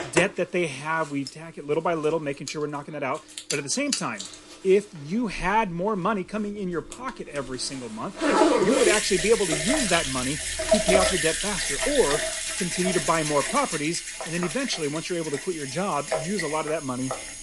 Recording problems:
garbled, watery; slightly
household noises; very loud; throughout; 1 dB above the speech

